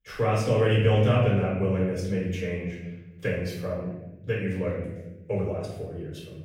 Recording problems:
off-mic speech; far
room echo; noticeable; dies away in 1.1 s

